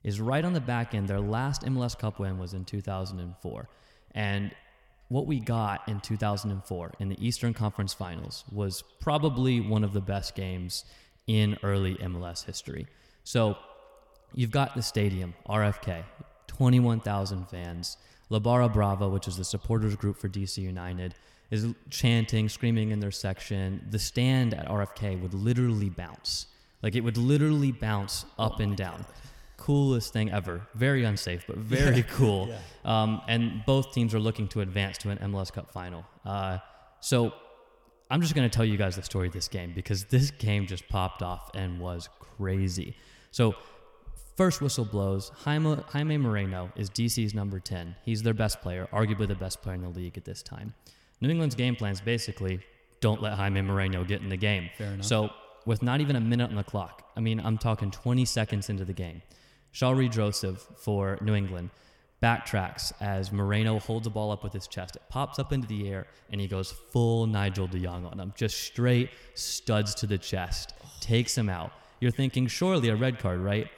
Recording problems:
echo of what is said; faint; throughout; 110 ms later, 20 dB below the speech

